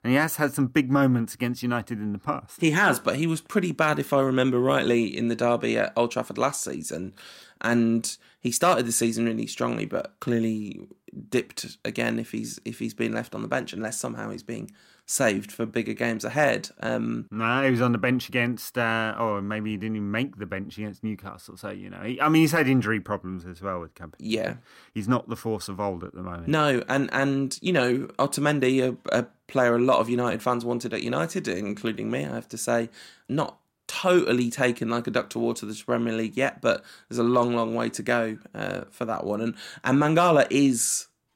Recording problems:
none

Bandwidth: 16 kHz